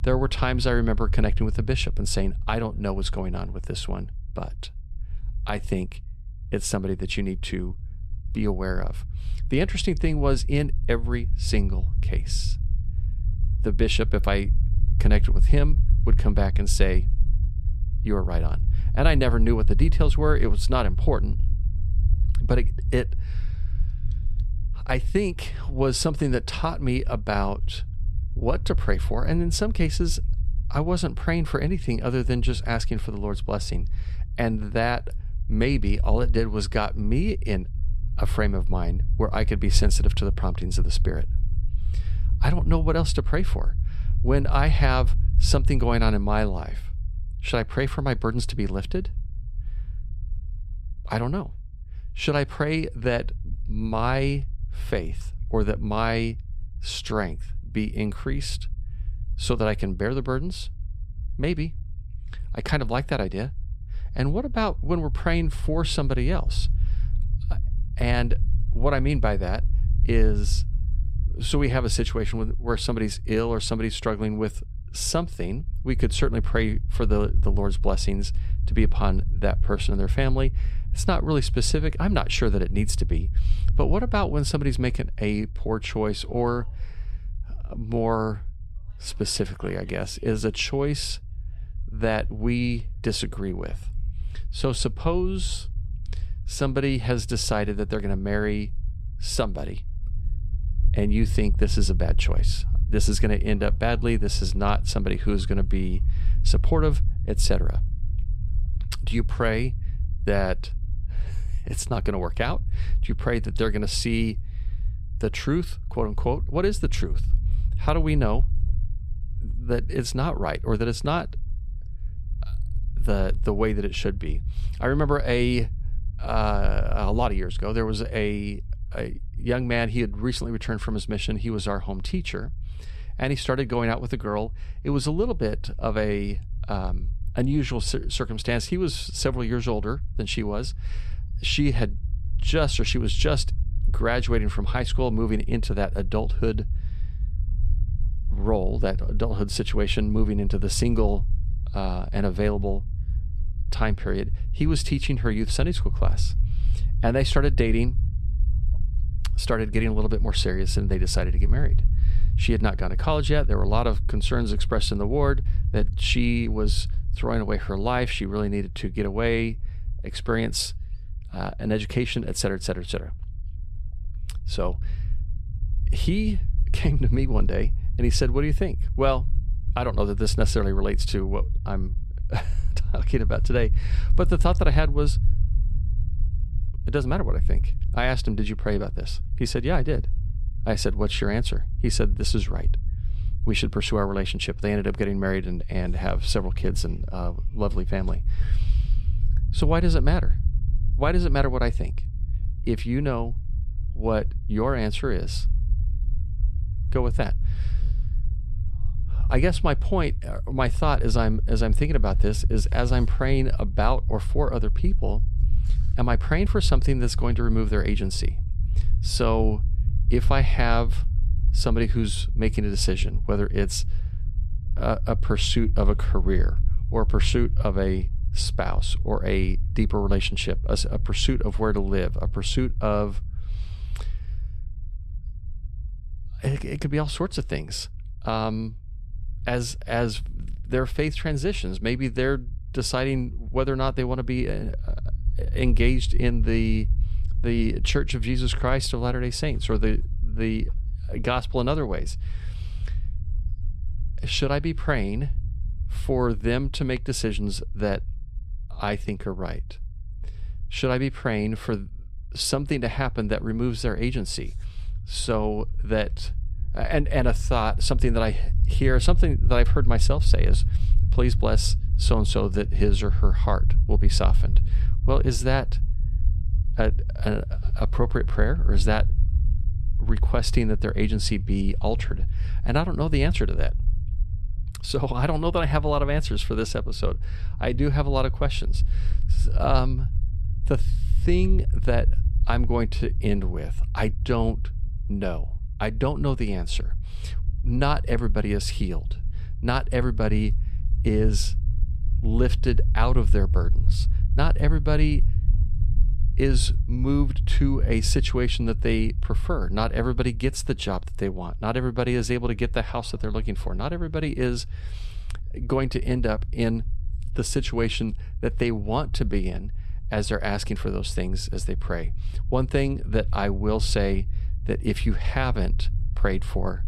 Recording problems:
low rumble; noticeable; throughout; 20 dB below the speech

